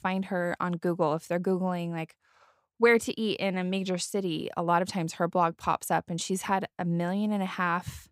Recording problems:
none

